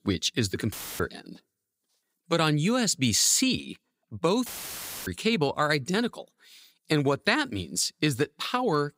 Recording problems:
audio cutting out; filled with static; at 0.5 s and at 4.5 s for 0.5 s

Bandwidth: 15.5 kHz